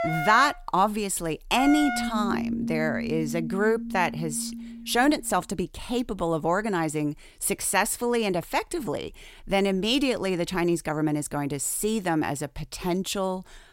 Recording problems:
background music; loud; until 5.5 s; 5 dB below the speech

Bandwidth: 16 kHz